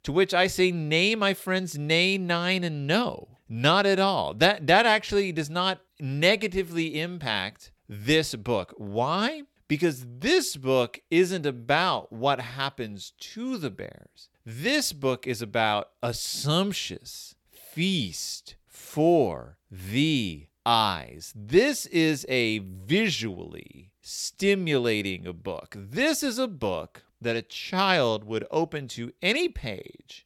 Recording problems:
none

